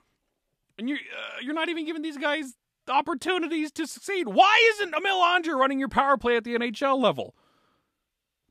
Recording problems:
none

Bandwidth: 14.5 kHz